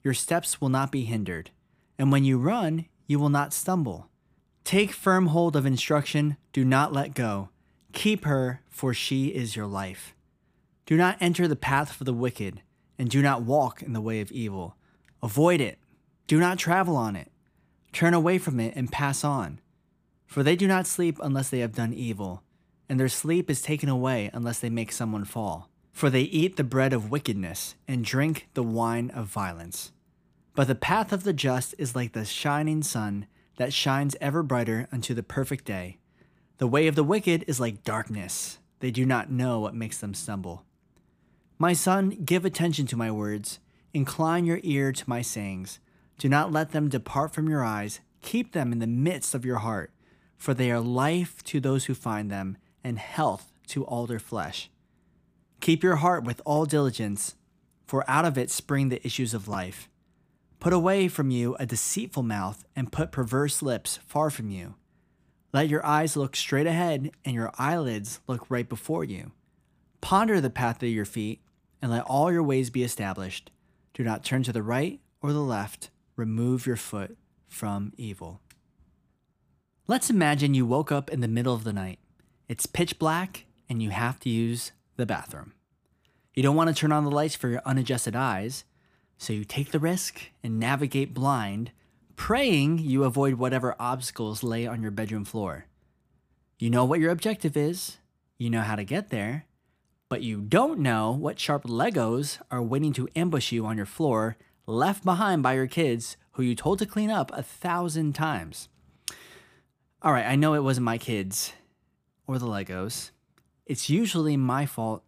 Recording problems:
none

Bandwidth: 15 kHz